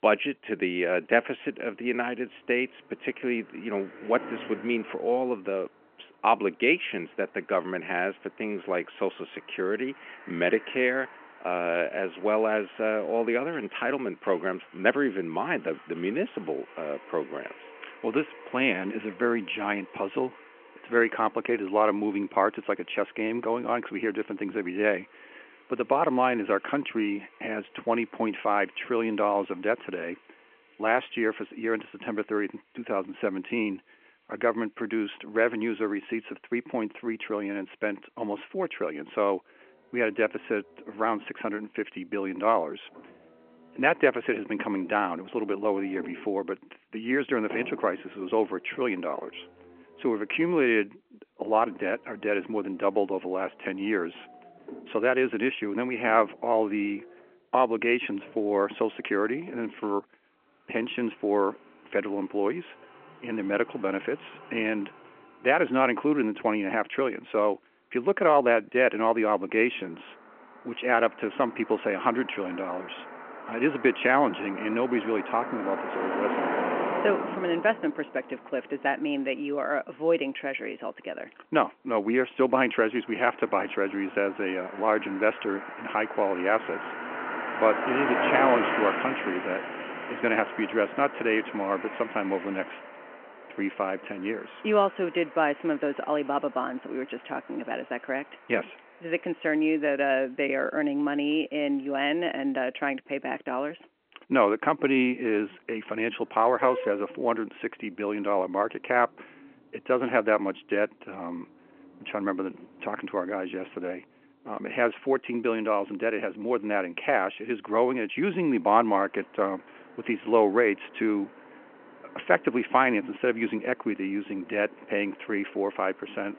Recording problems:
phone-call audio
traffic noise; loud; throughout; 10 dB below the speech

